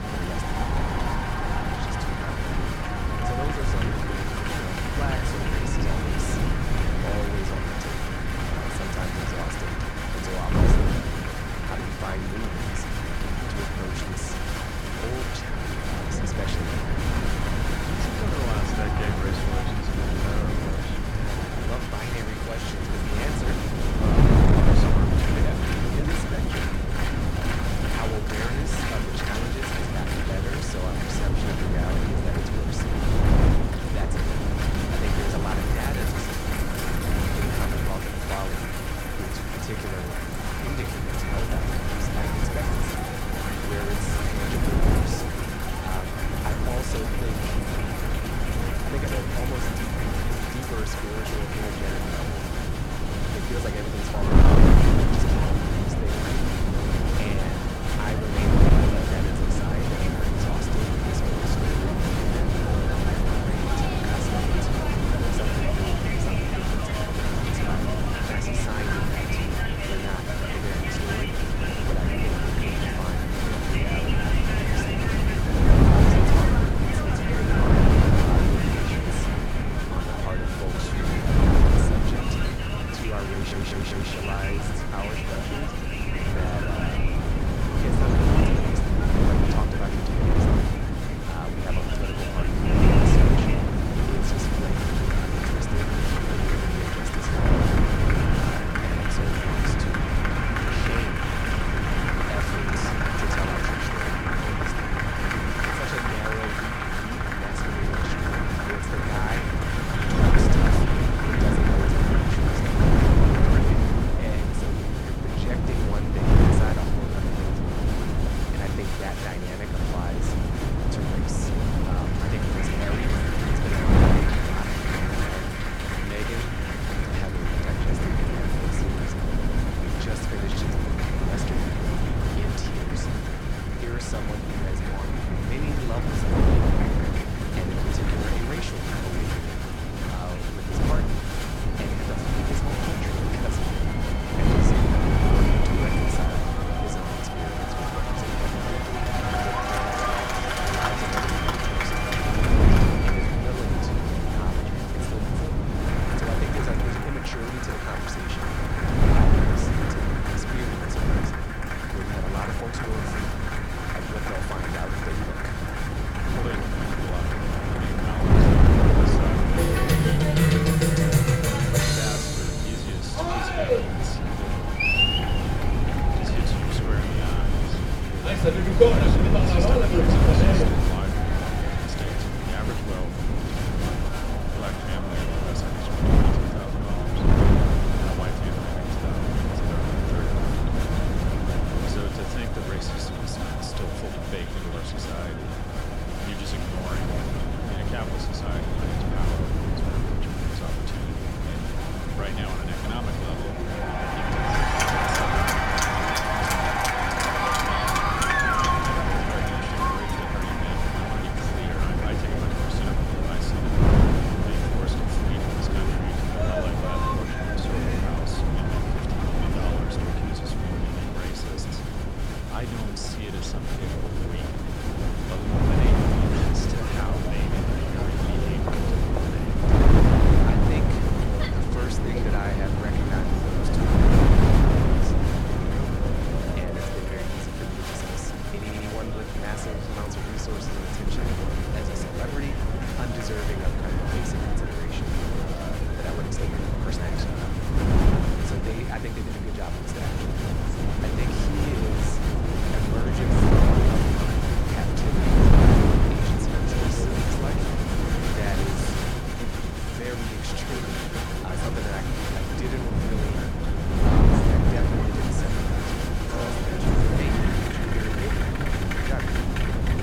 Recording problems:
crowd noise; very loud; throughout; 5 dB above the speech
wind noise on the microphone; heavy; 5 dB above the speech
audio stuttering; at 1:23, at 2:09 and at 3:59

